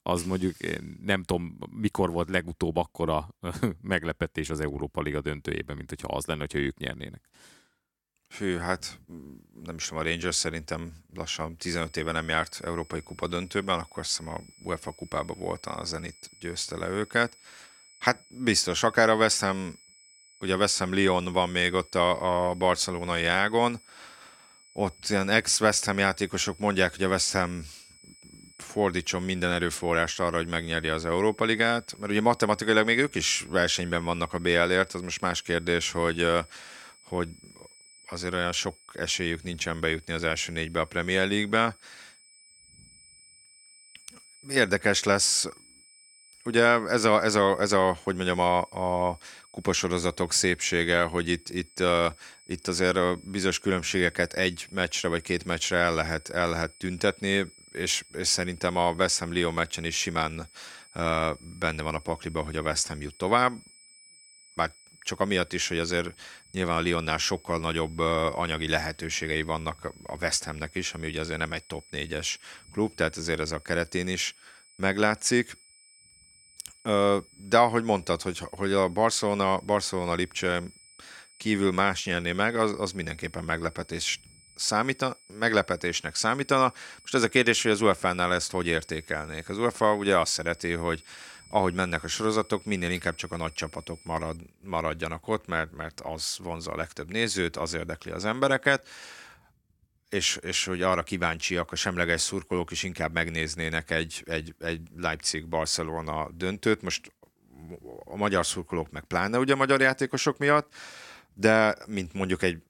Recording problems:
high-pitched whine; faint; from 12 s to 1:34; 8 kHz, 25 dB below the speech

